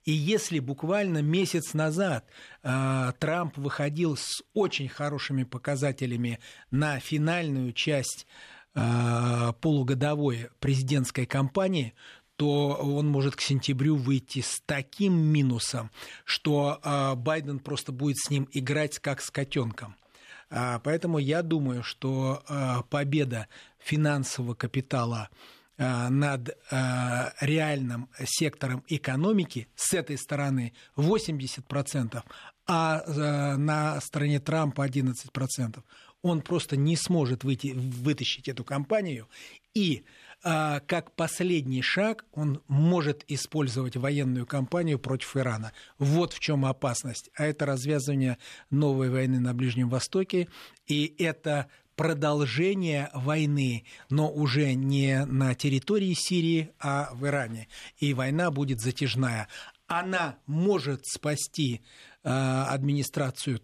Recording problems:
none

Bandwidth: 14 kHz